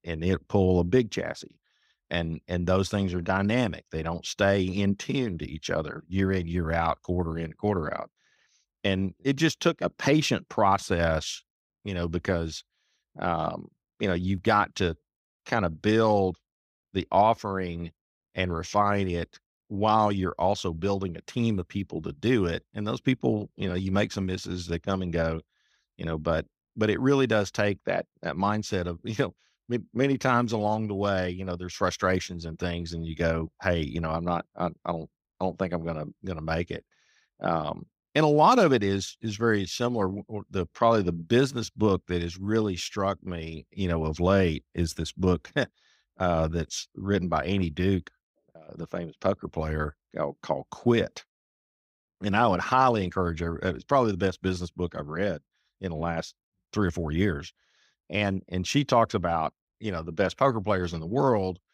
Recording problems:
none

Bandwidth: 15.5 kHz